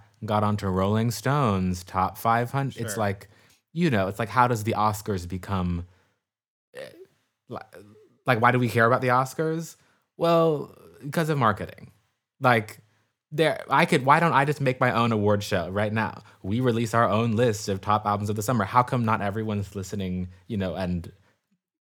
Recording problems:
none

